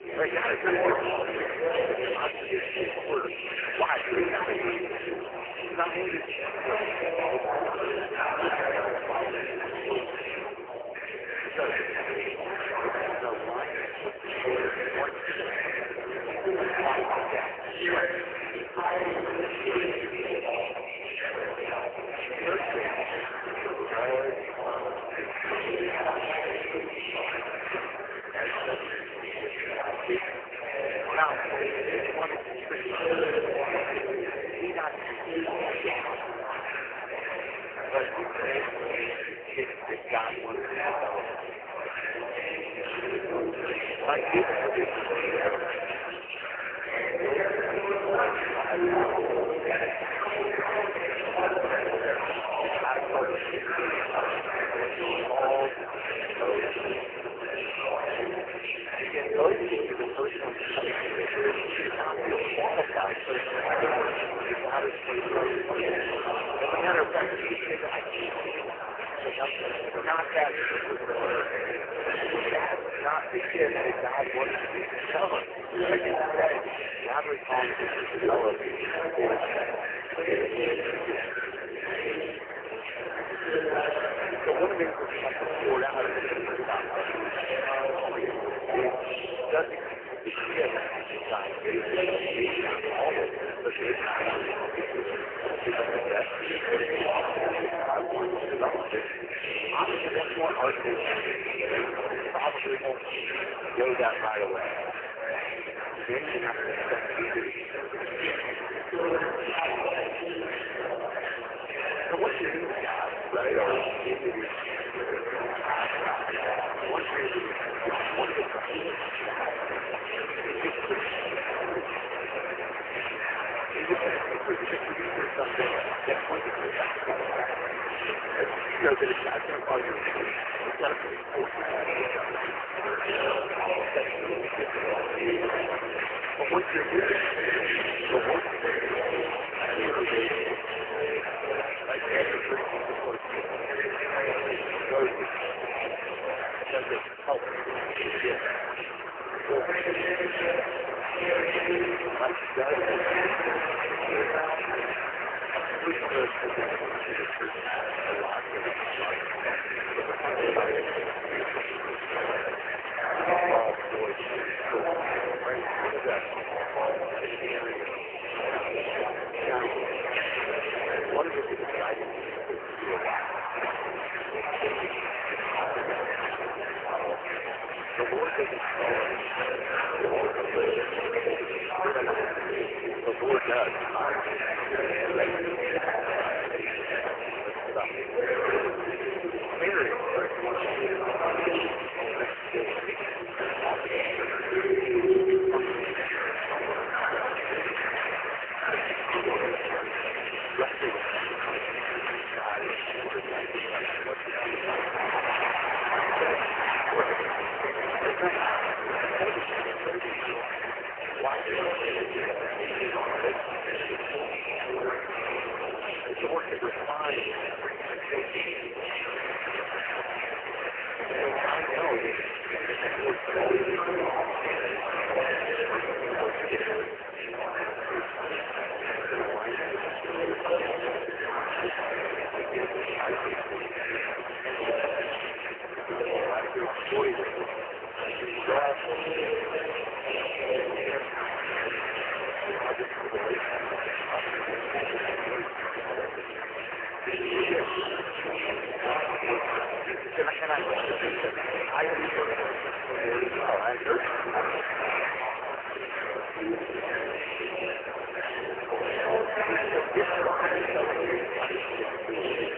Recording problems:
phone-call audio; poor line; nothing above 3 kHz
garbled, watery; badly
murmuring crowd; very loud; throughout; 2 dB above the speech
household noises; noticeable; from 2:04 on; 20 dB below the speech

